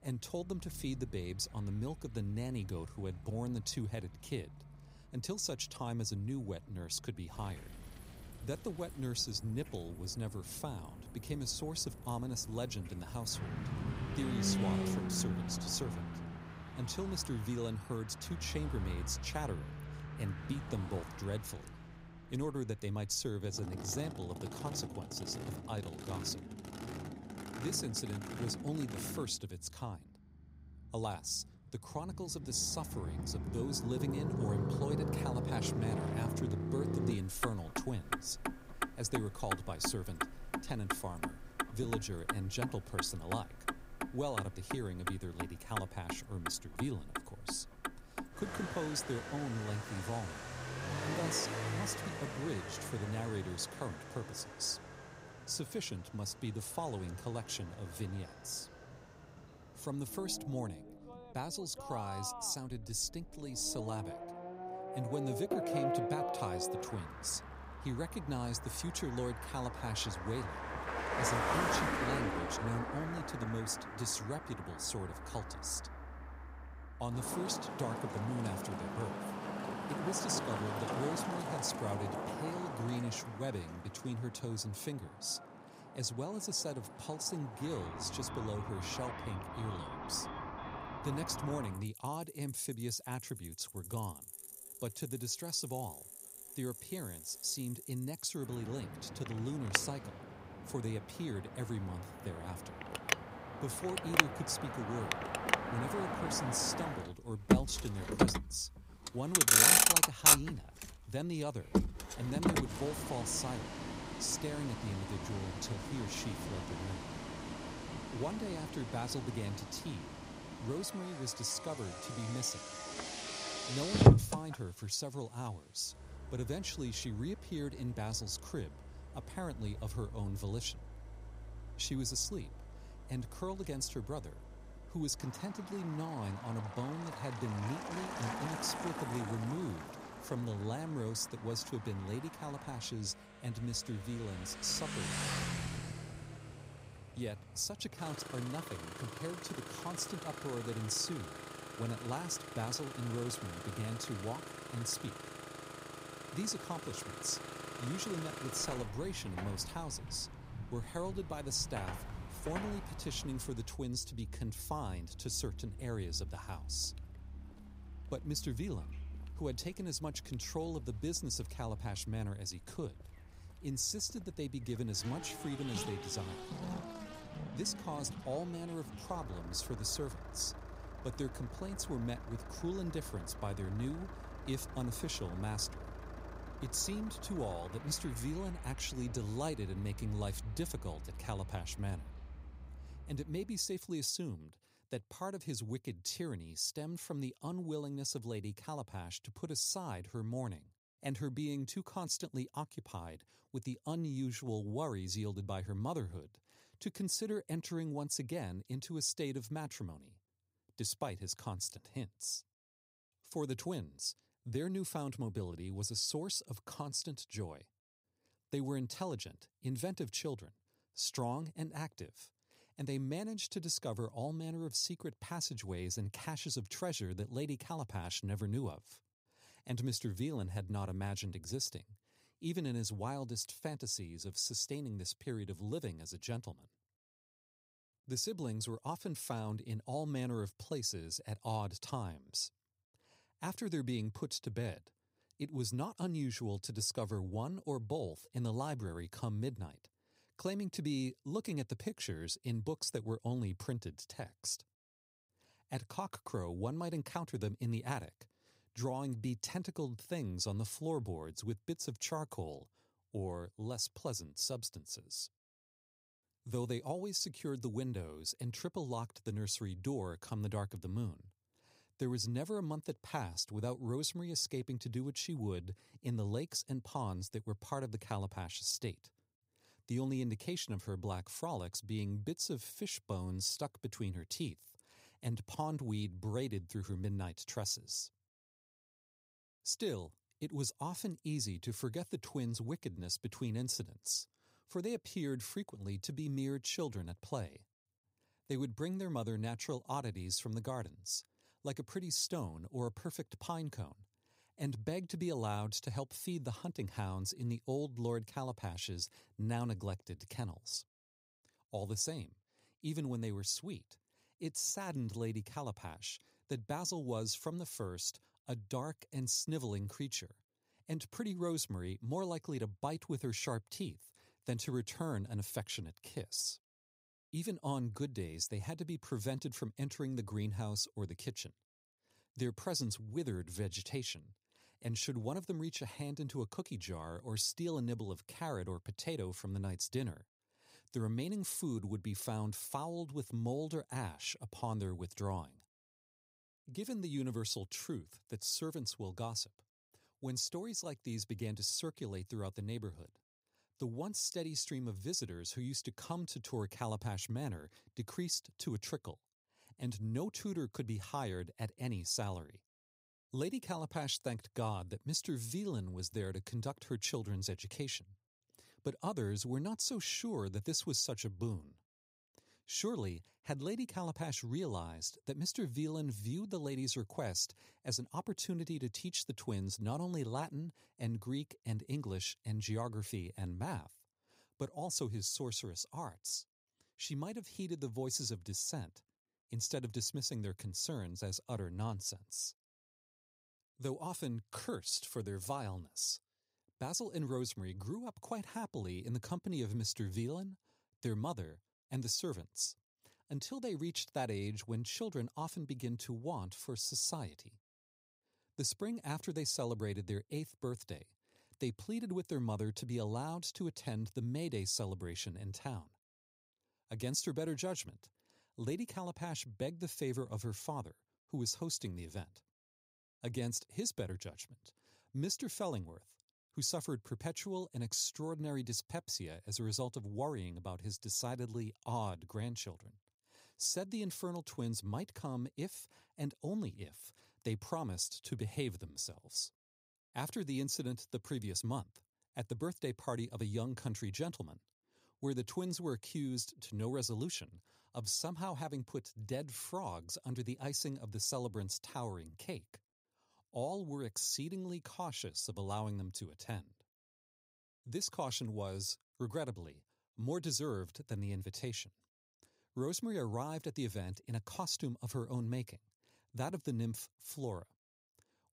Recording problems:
traffic noise; very loud; until 3:14; 1 dB above the speech

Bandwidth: 15.5 kHz